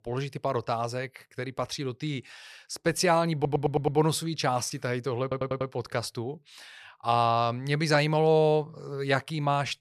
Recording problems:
audio stuttering; at 3.5 s and at 5 s

